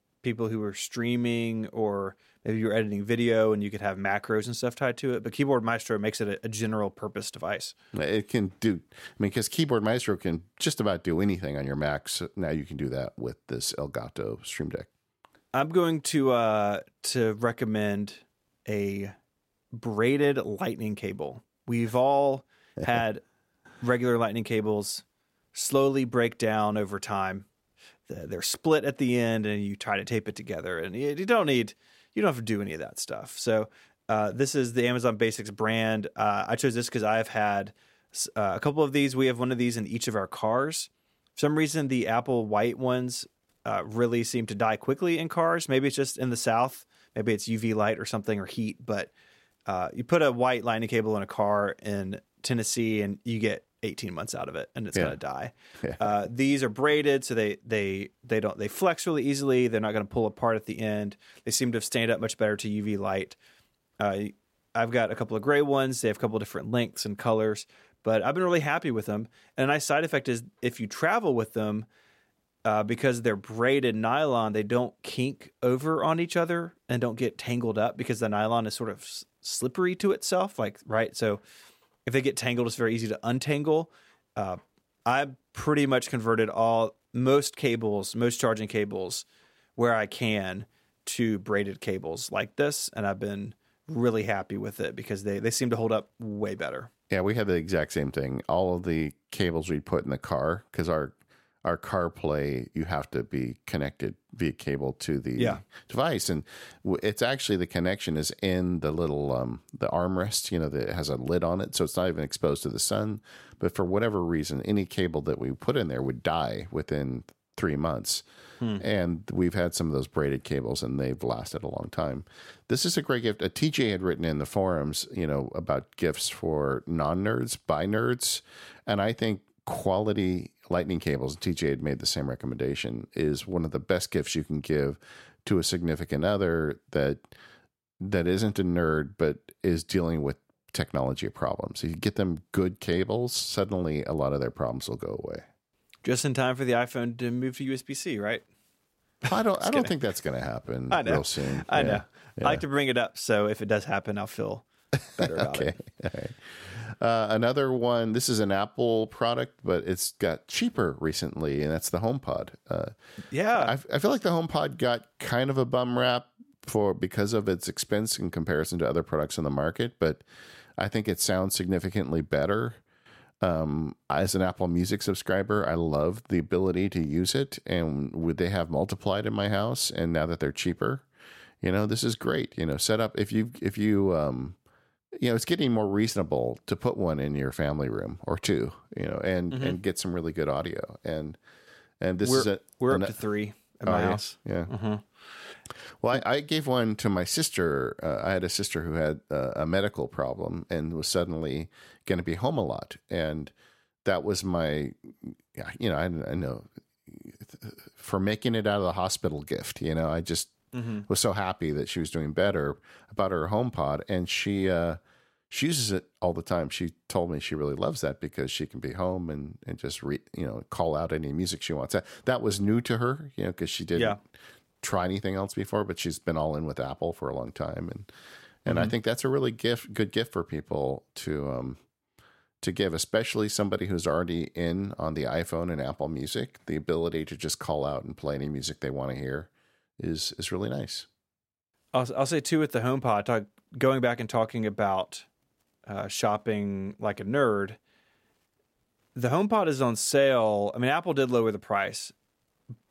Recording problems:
none

